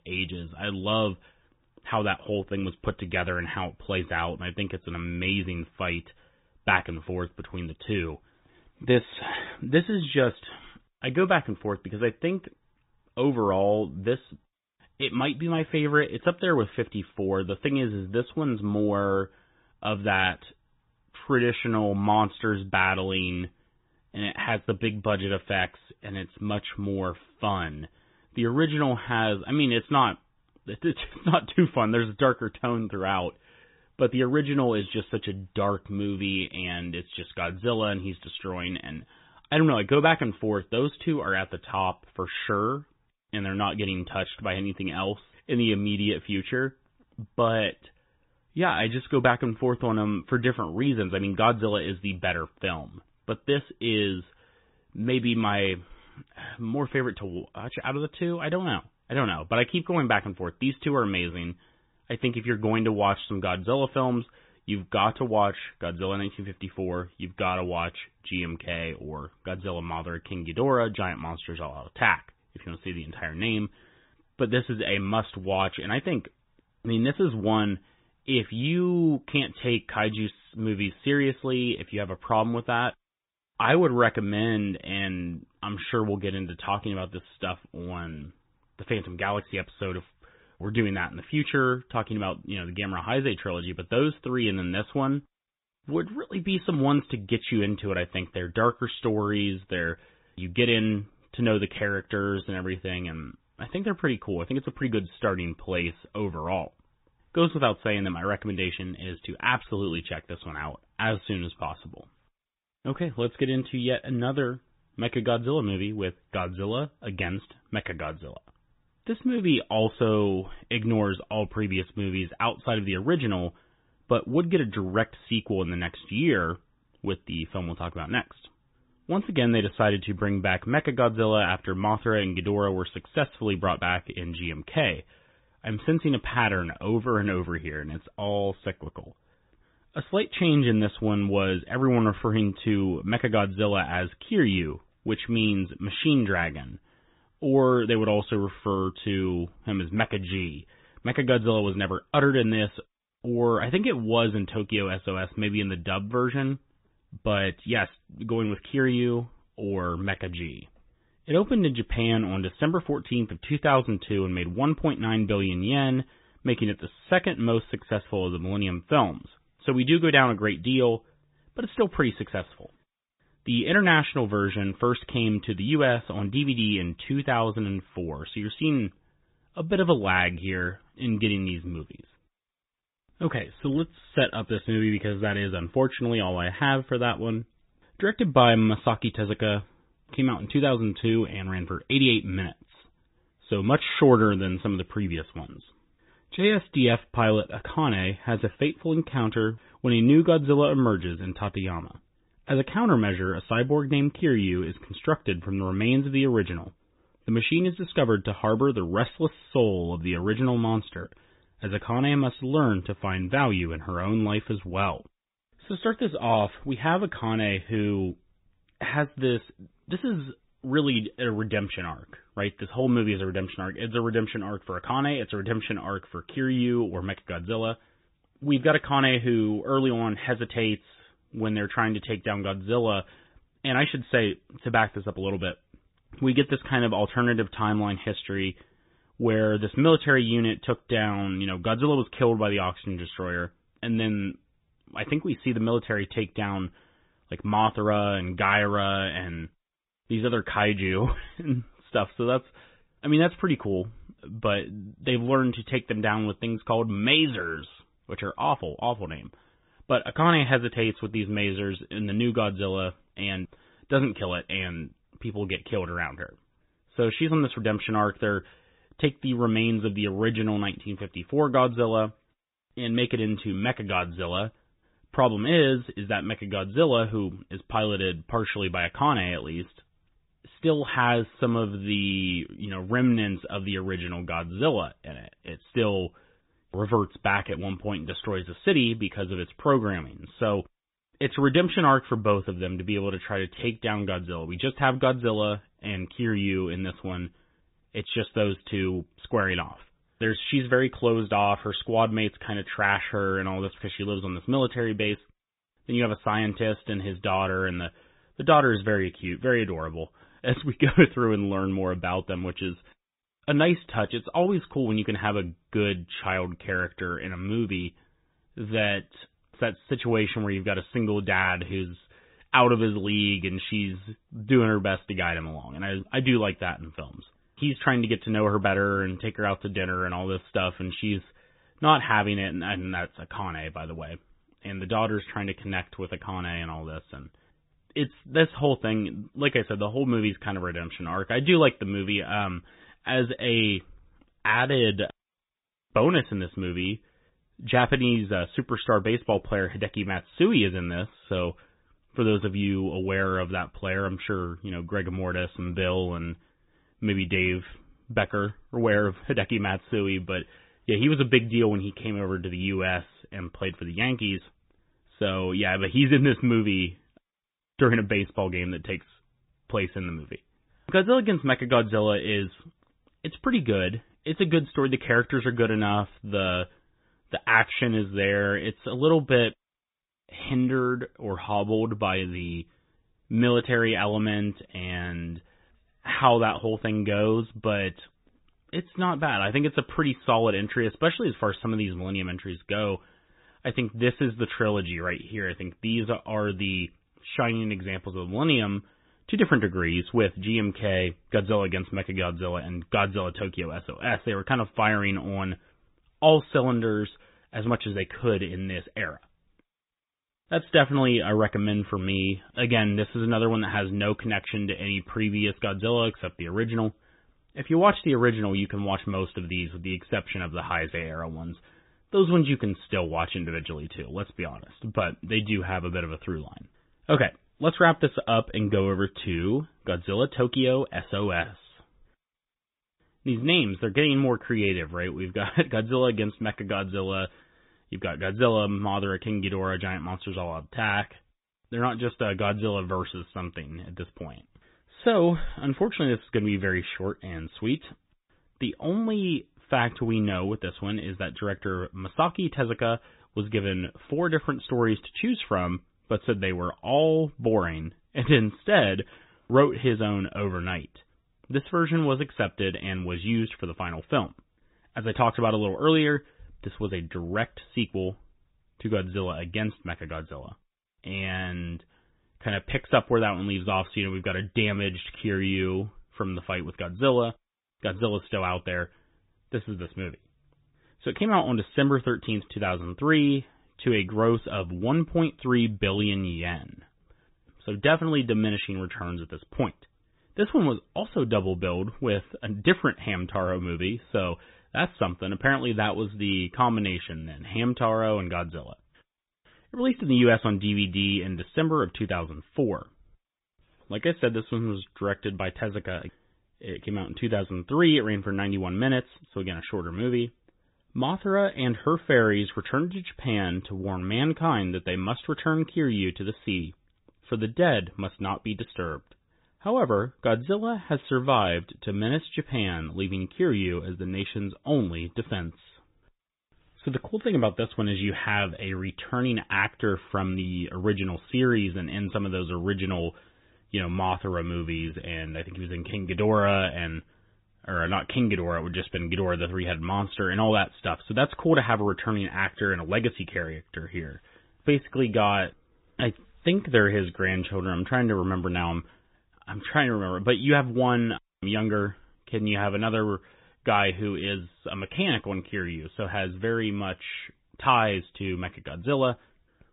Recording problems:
high frequencies cut off; severe; nothing above 3.5 kHz
garbled, watery; slightly

